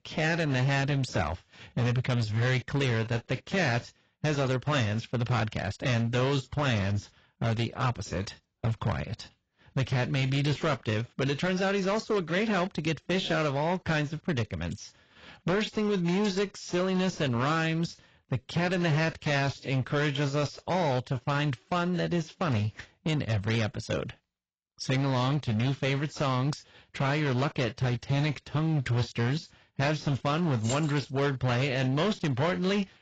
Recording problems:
garbled, watery; badly; nothing above 7.5 kHz
distortion; slight; 14% of the sound clipped
jangling keys; noticeable; at 31 s; peak 8 dB below the speech

